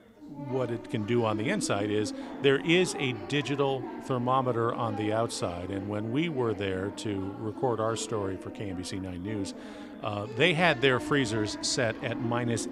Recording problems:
background chatter; noticeable; throughout; 3 voices, 10 dB below the speech

